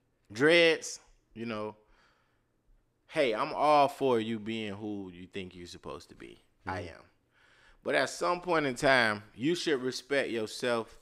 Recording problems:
none

